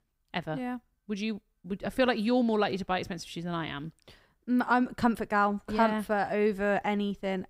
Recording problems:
none

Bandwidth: 15.5 kHz